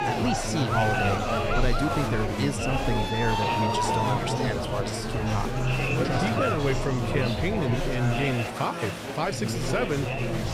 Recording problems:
chatter from many people; very loud; throughout; 2 dB above the speech

